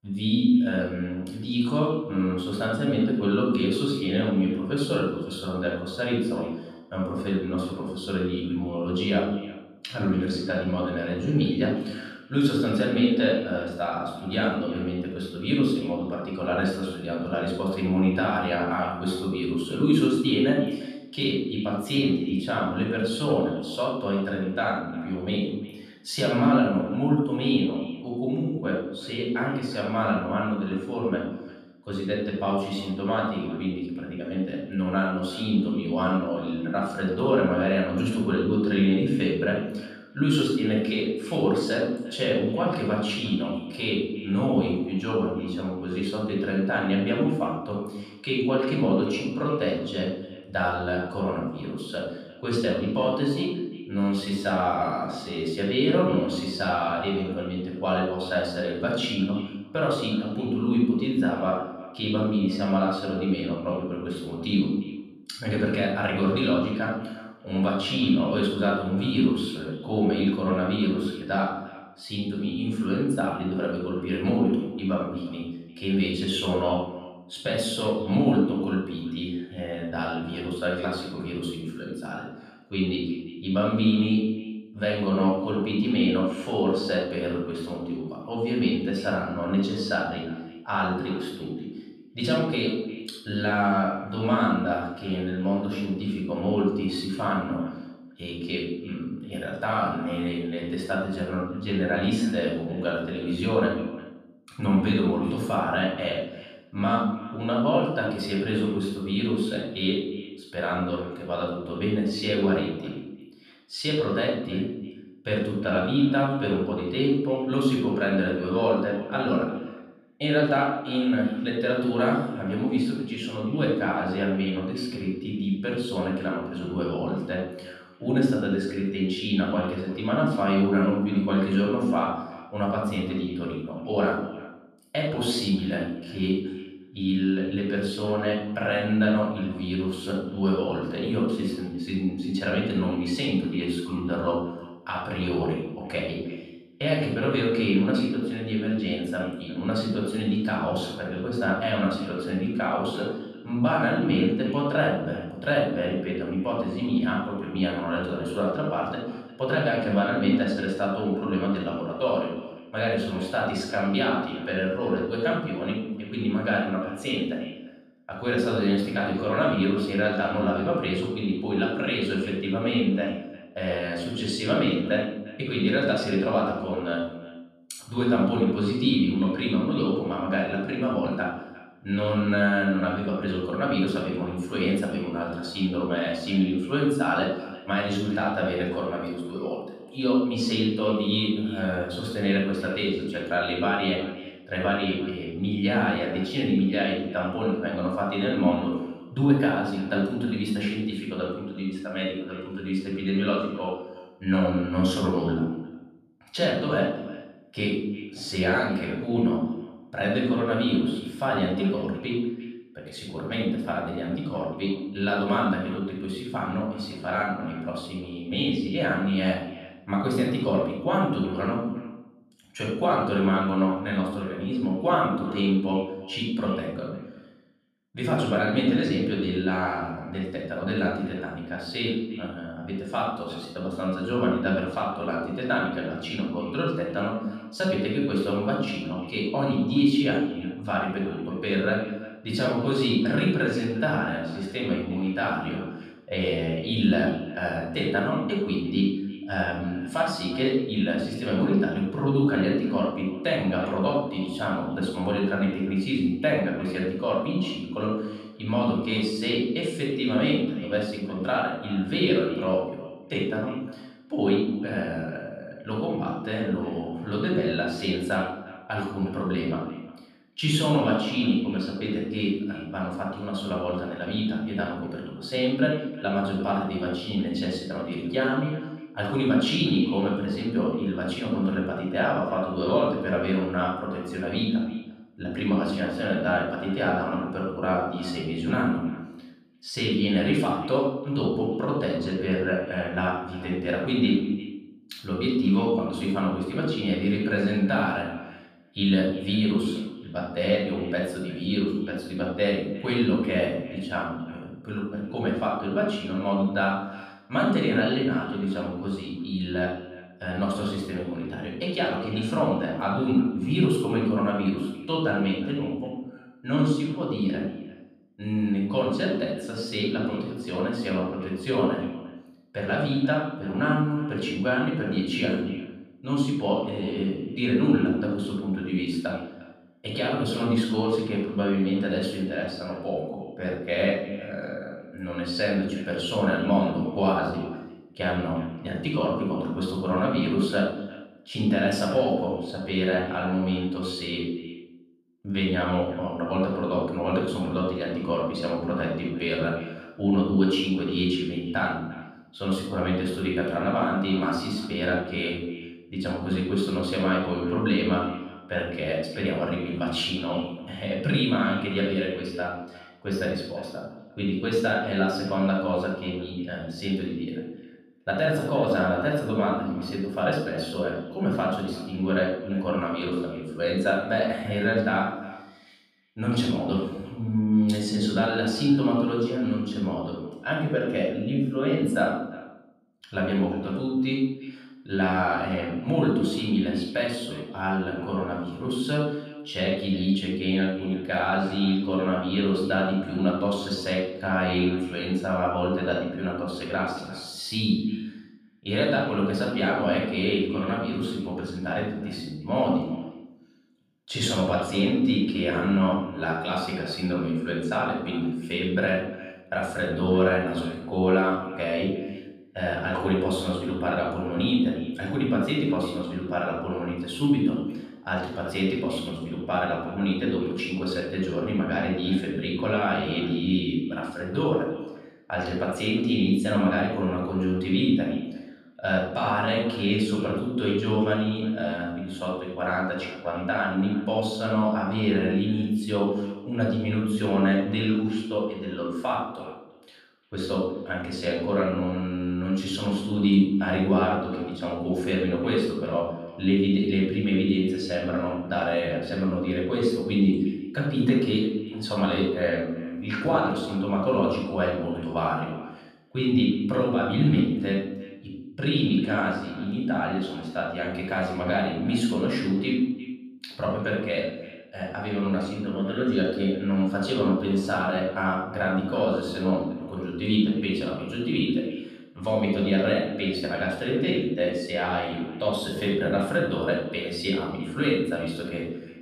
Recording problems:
off-mic speech; far
room echo; noticeable; dies away in 0.7 s
echo of what is said; faint; throughout; 350 ms later, 20 dB below the speech

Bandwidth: 14.5 kHz